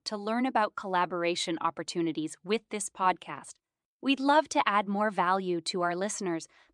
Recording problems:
none

